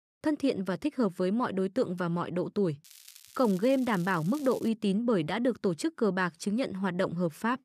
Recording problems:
crackling; faint; from 3 to 4.5 s; 20 dB below the speech

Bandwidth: 14.5 kHz